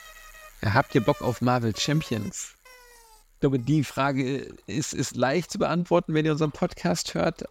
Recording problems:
traffic noise; faint; throughout; 20 dB below the speech

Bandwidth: 16 kHz